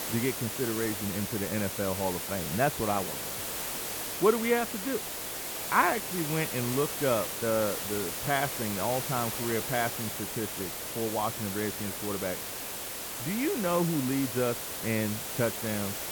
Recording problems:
muffled; very; fading above 2.5 kHz
hiss; loud; throughout; 2 dB below the speech

